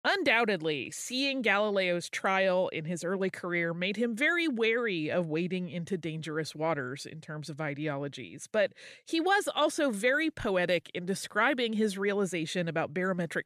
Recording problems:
none

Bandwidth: 14.5 kHz